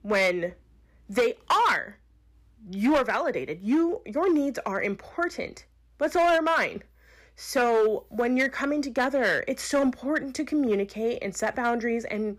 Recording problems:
distortion; slight; 6% of the sound clipped

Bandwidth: 15 kHz